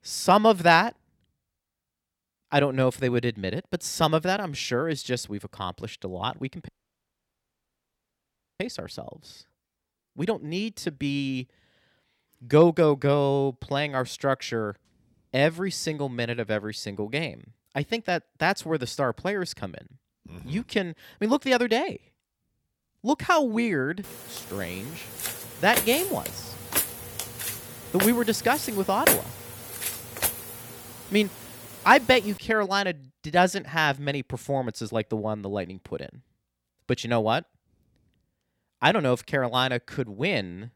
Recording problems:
audio cutting out; at 6.5 s for 2 s
footsteps; loud; from 25 to 30 s; peak 4 dB above the speech

